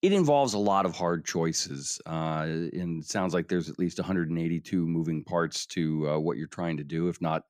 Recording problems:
none

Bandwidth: 15 kHz